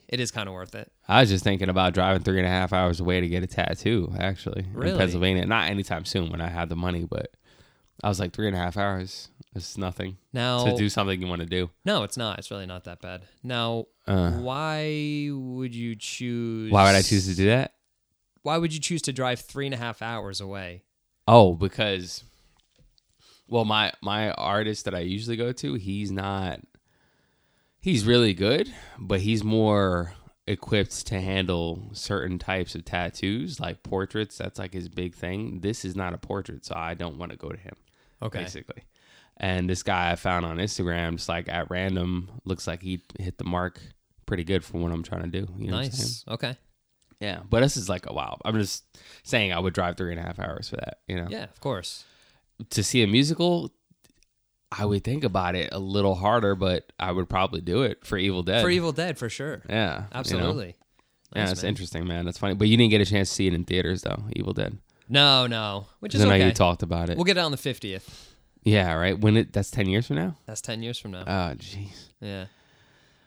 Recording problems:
none

